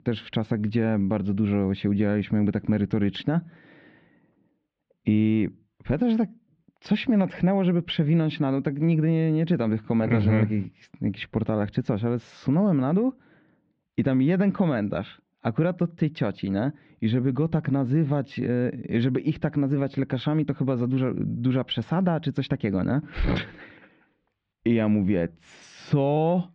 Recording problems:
muffled; very; fading above 3 kHz

